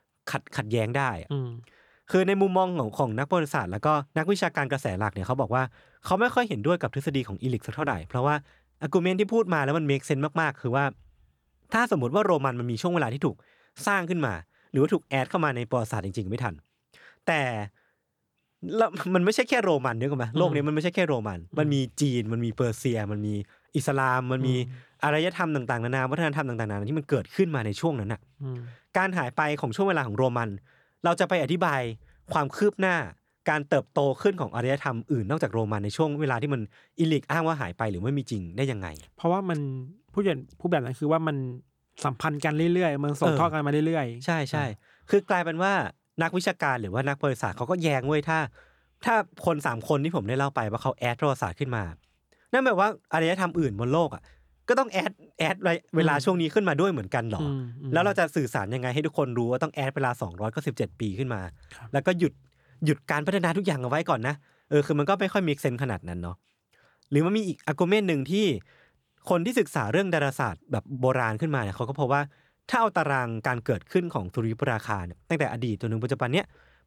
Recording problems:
none

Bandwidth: 18.5 kHz